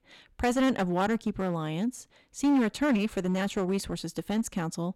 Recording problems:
distortion; slight; 8% of the sound clipped

